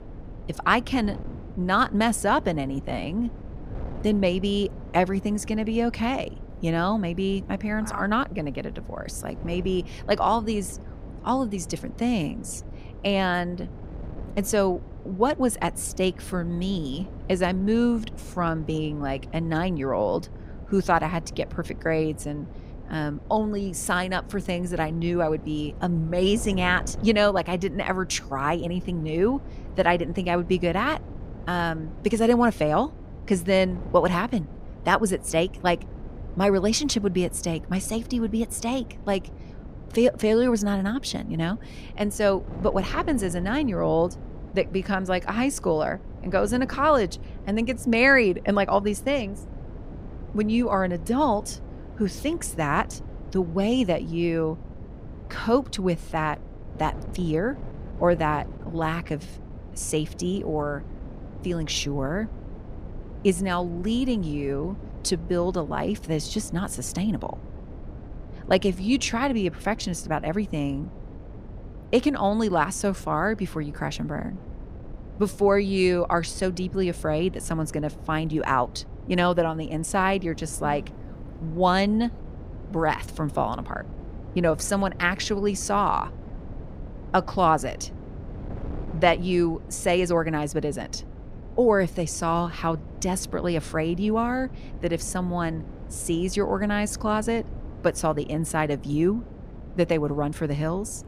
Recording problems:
wind noise on the microphone; occasional gusts; 20 dB below the speech

